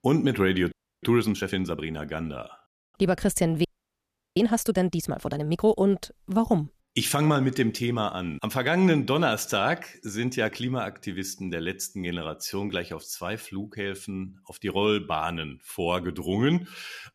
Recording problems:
audio freezing; at 0.5 s and at 3.5 s for 0.5 s

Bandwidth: 14.5 kHz